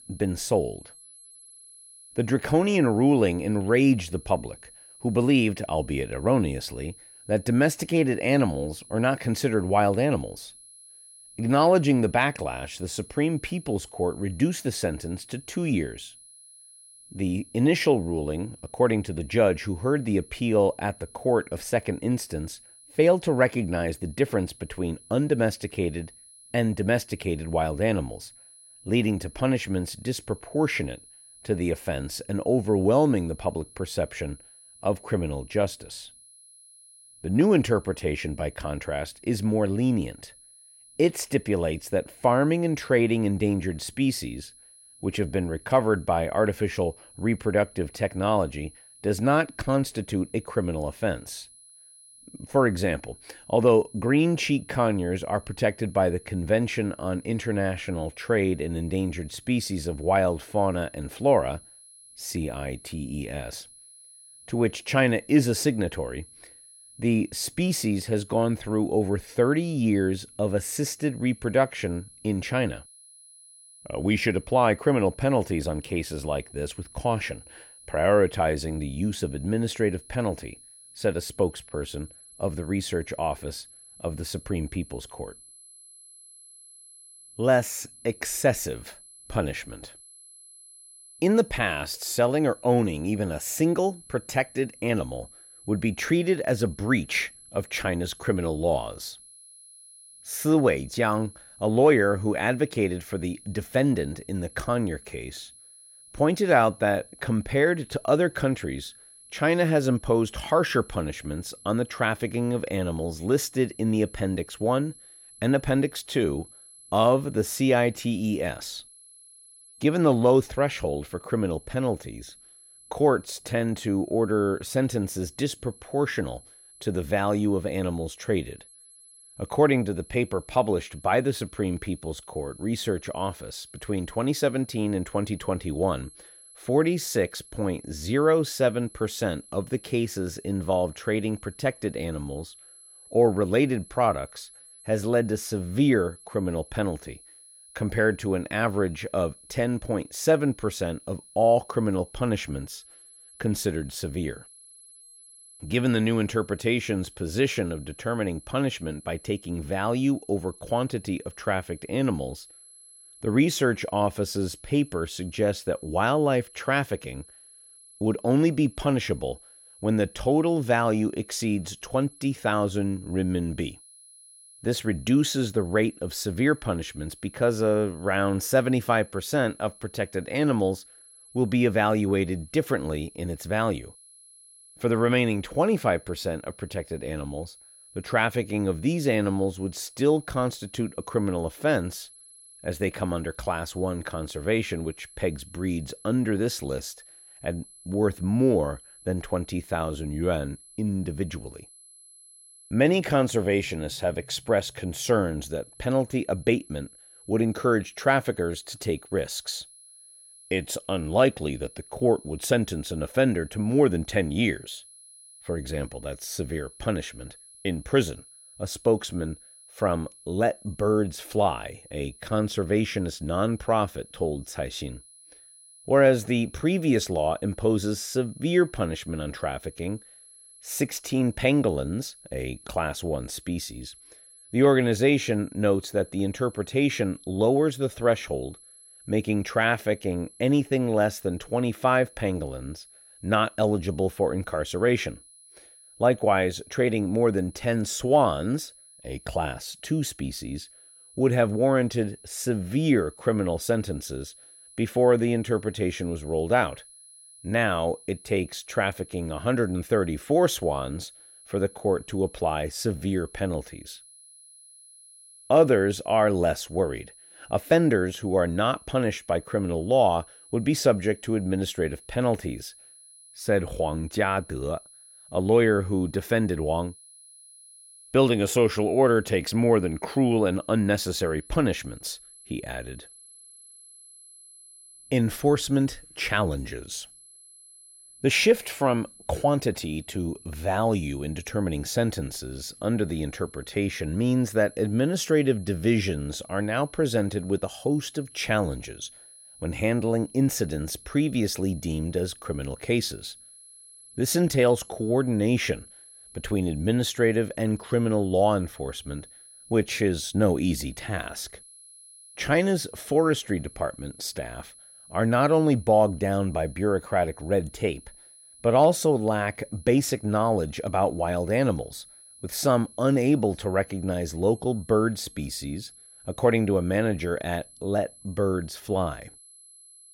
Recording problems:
high-pitched whine; faint; throughout; 10.5 kHz, 20 dB below the speech

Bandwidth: 16 kHz